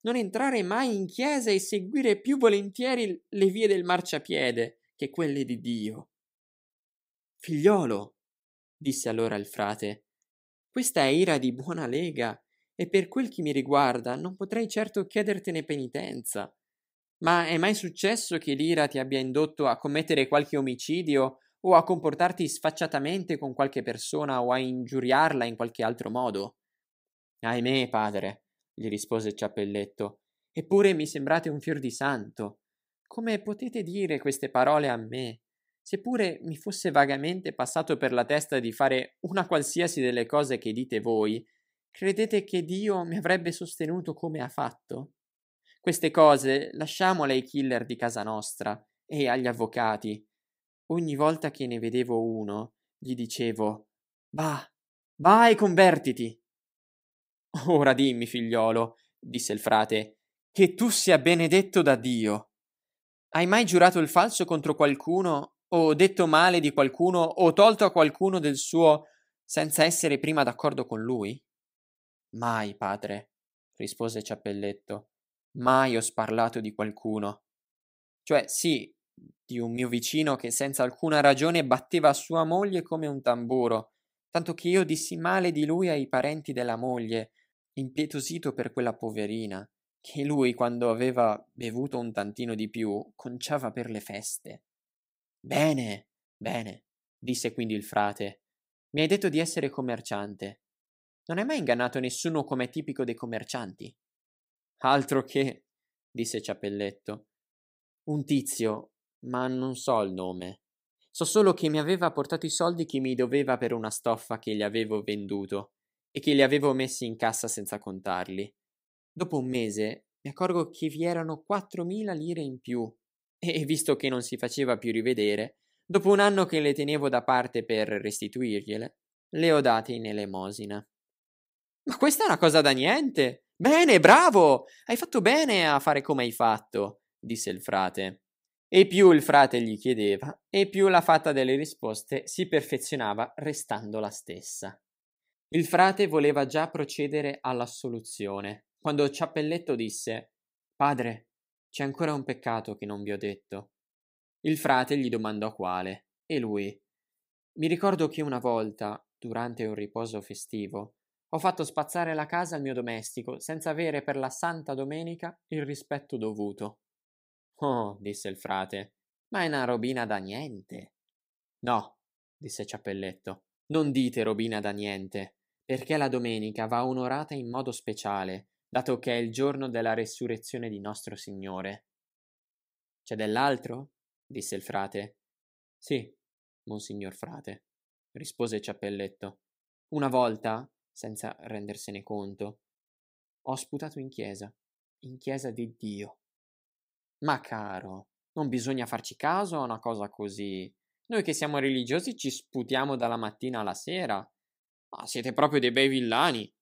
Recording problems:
none

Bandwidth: 15.5 kHz